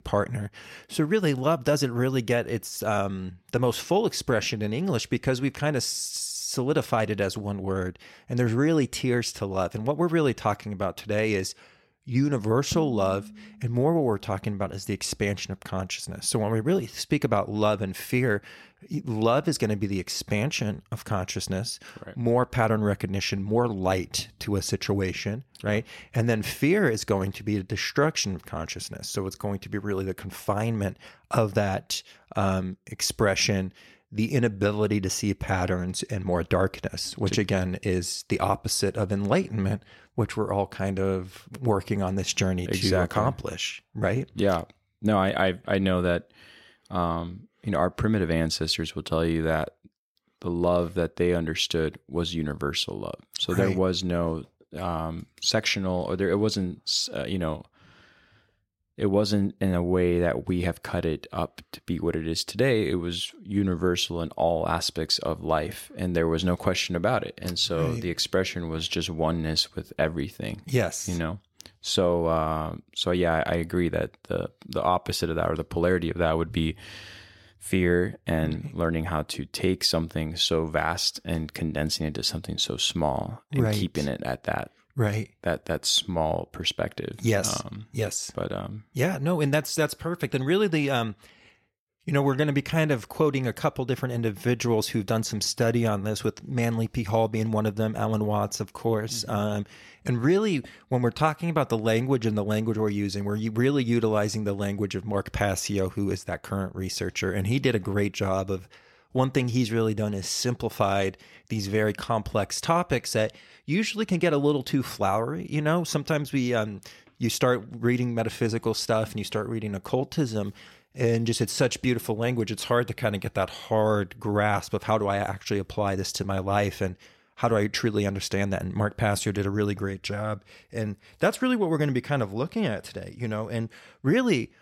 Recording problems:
none

